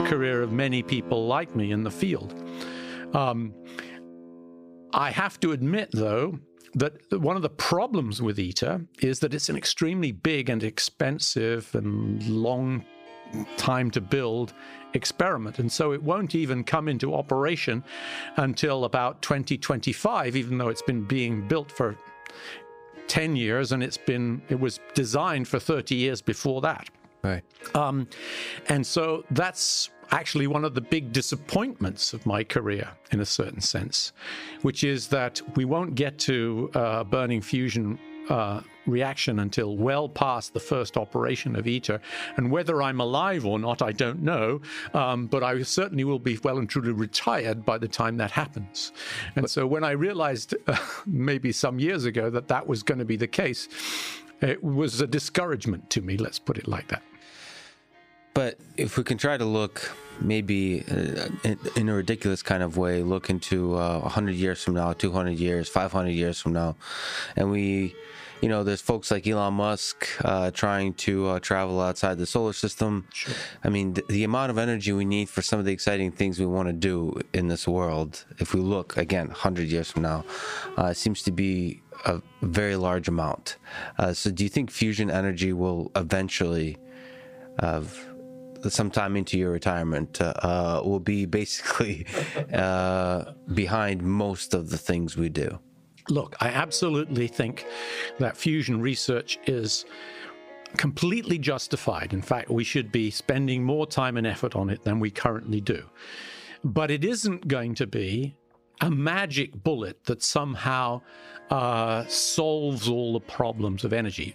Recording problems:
squashed, flat; somewhat, background pumping
background music; faint; throughout; 20 dB below the speech

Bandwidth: 15 kHz